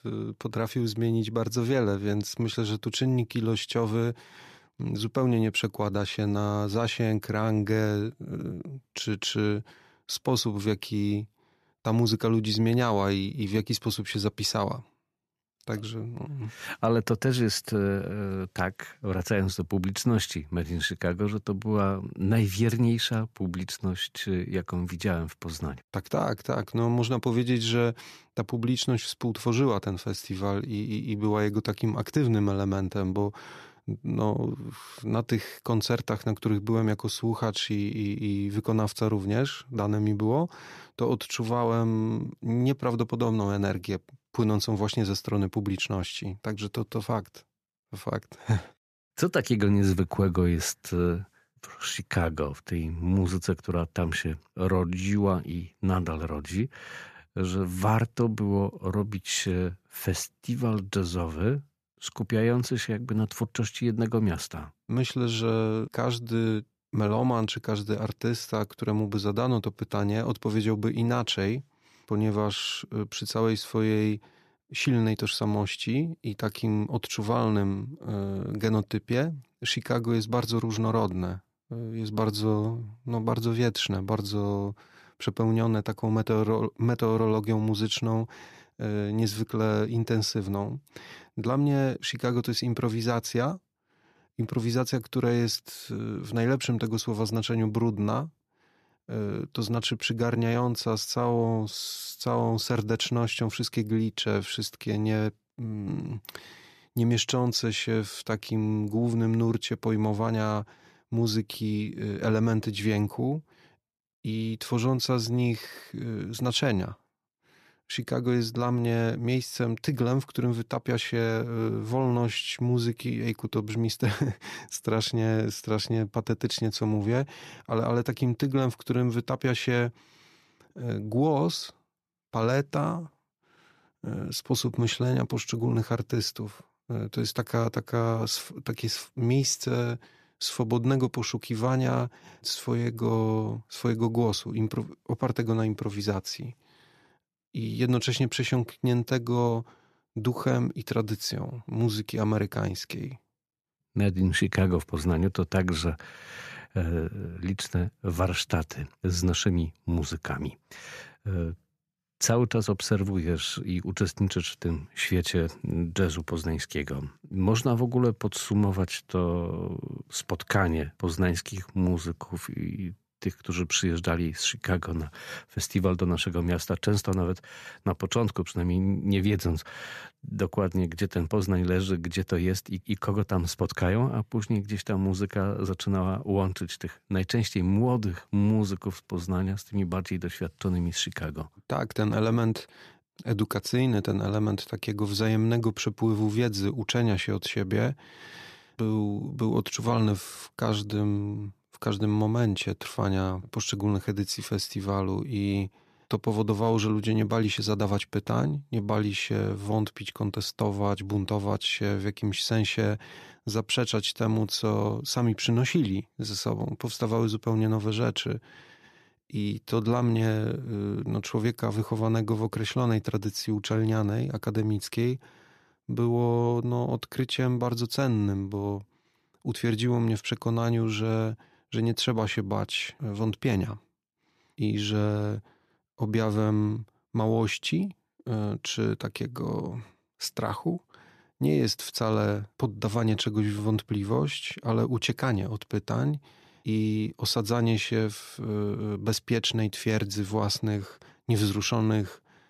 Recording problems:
none

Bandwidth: 14.5 kHz